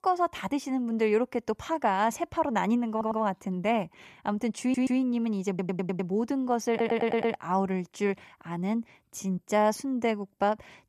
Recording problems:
audio stuttering; 4 times, first at 3 s

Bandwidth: 14.5 kHz